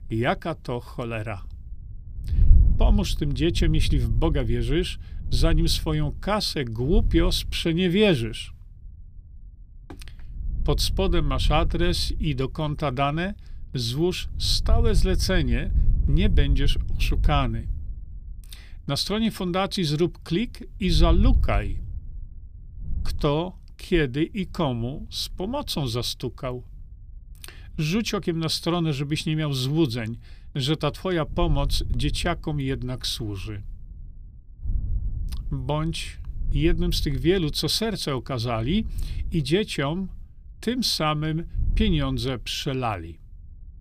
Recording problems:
wind noise on the microphone; occasional gusts; 20 dB below the speech

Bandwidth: 14.5 kHz